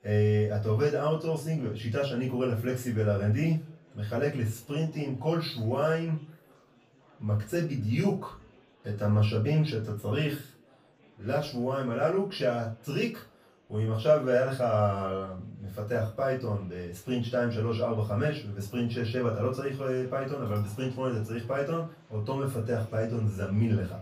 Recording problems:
off-mic speech; far
room echo; slight; dies away in 0.3 s
murmuring crowd; faint; throughout; 30 dB below the speech

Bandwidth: 15 kHz